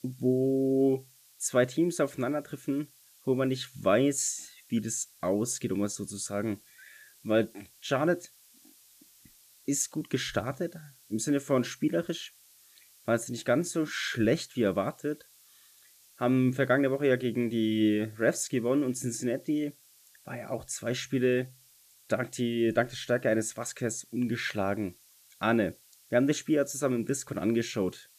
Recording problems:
hiss; faint; throughout; 25 dB below the speech

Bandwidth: 14.5 kHz